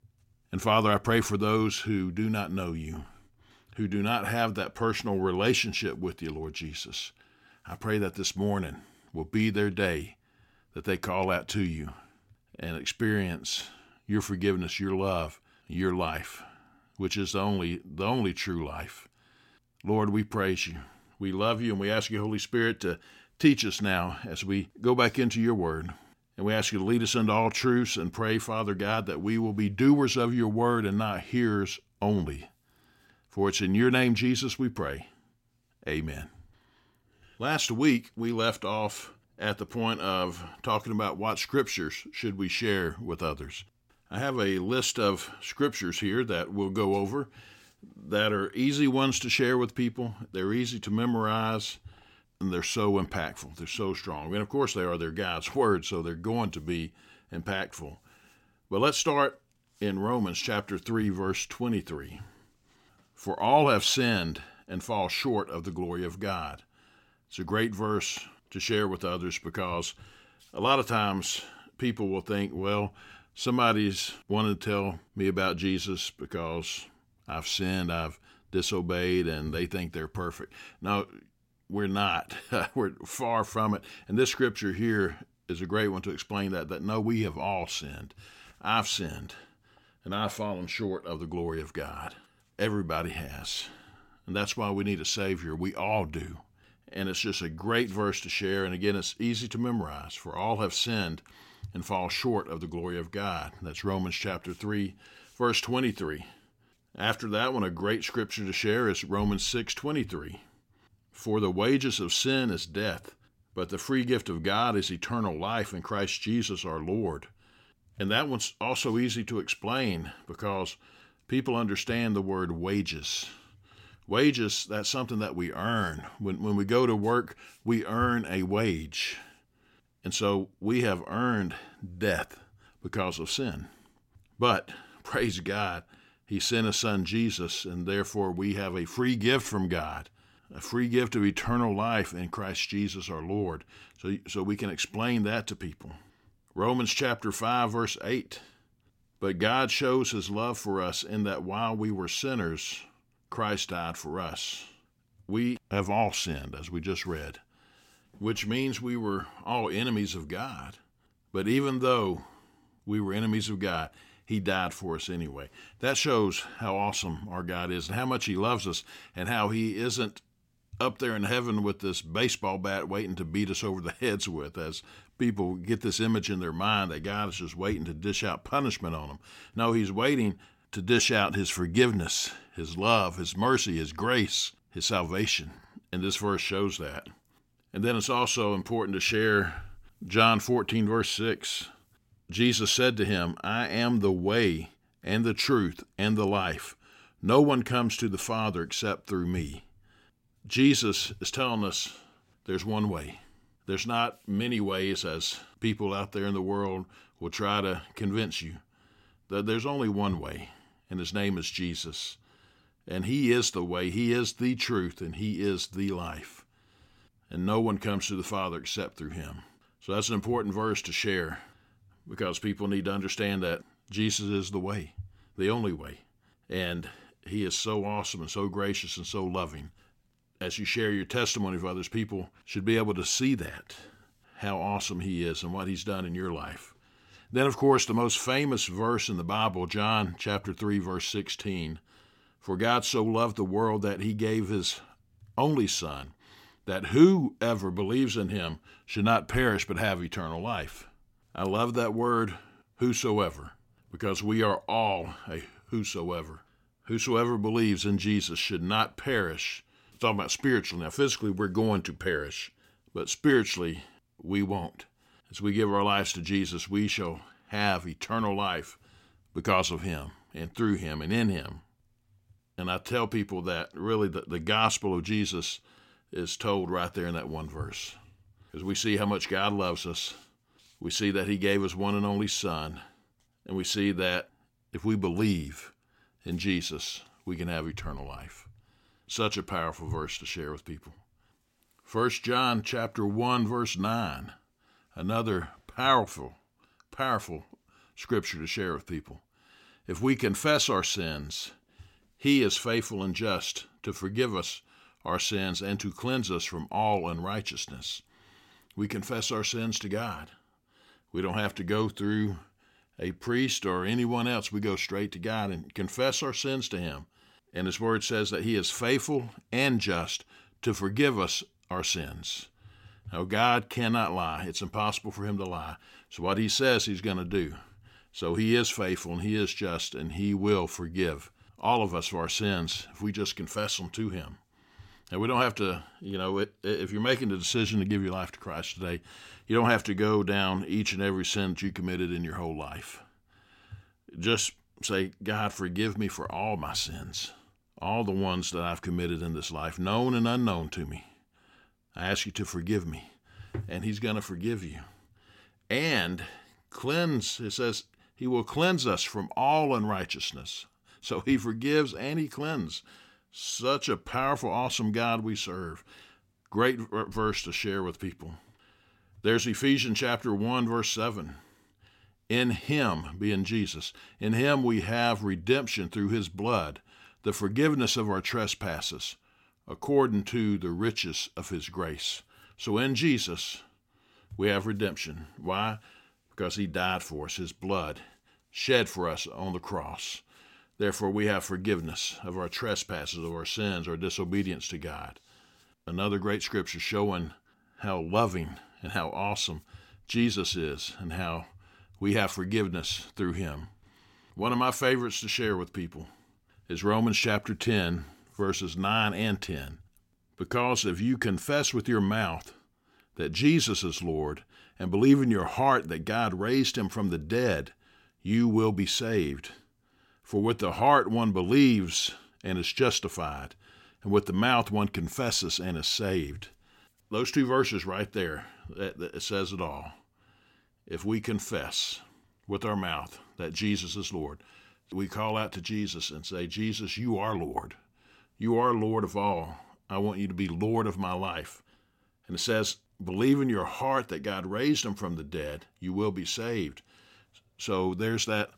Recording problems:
none

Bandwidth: 16.5 kHz